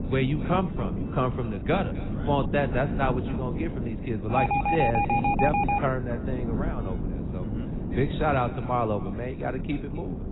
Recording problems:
garbled, watery; badly; nothing above 4 kHz
echo of what is said; faint; throughout; 260 ms later, 20 dB below the speech
wind noise on the microphone; heavy; 10 dB below the speech
traffic noise; noticeable; throughout; 20 dB below the speech
alarm; loud; from 4.5 to 6 s; peak 6 dB above the speech

